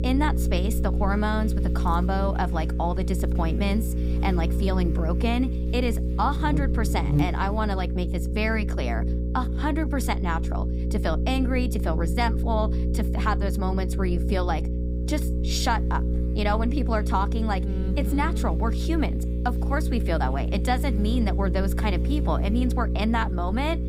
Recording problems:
electrical hum; loud; throughout; 60 Hz, 8 dB below the speech

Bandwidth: 15.5 kHz